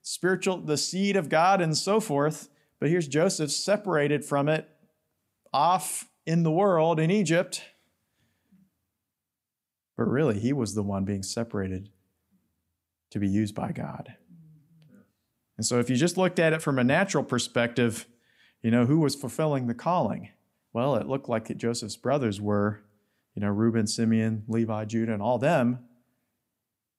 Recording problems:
none

